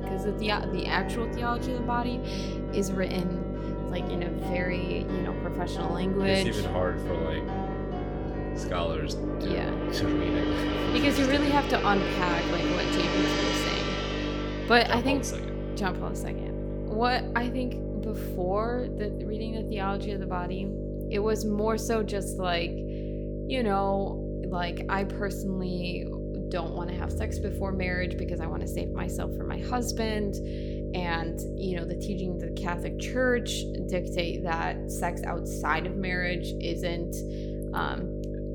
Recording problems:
electrical hum; loud; throughout; 50 Hz, 8 dB below the speech
background music; loud; throughout; 2 dB below the speech

